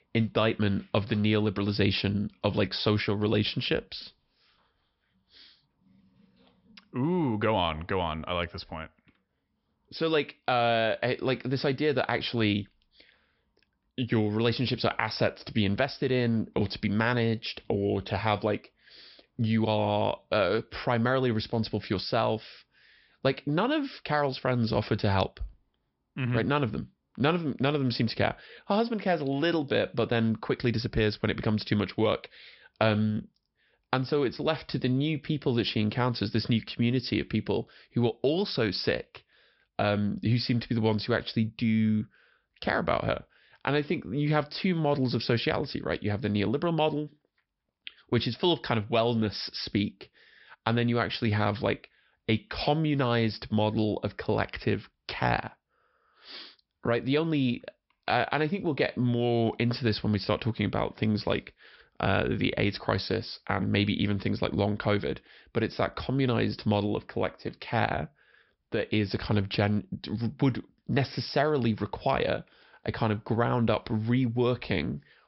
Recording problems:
high frequencies cut off; noticeable; nothing above 5.5 kHz

